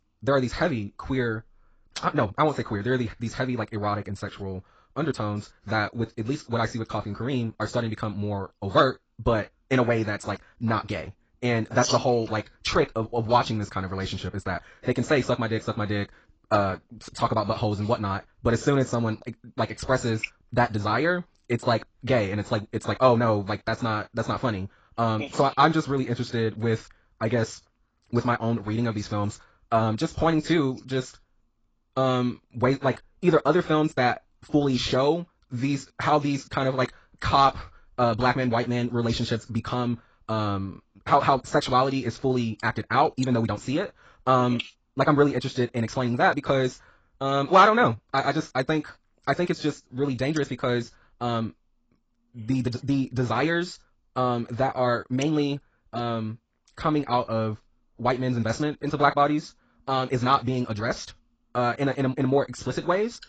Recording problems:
garbled, watery; badly; nothing above 7.5 kHz
wrong speed, natural pitch; too fast; 1.7 times normal speed

